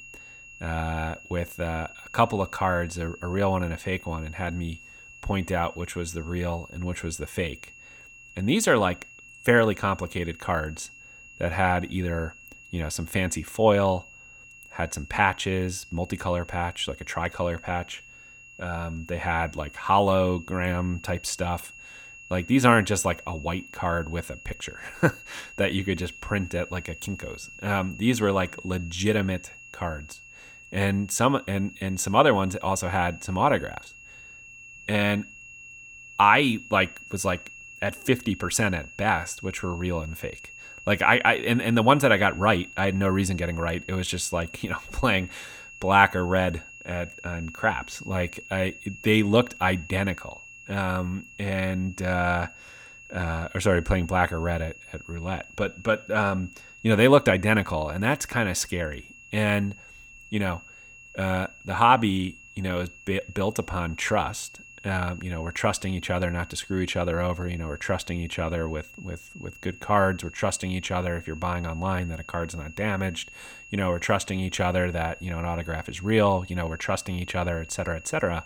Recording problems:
high-pitched whine; noticeable; throughout; 2.5 kHz, 20 dB below the speech

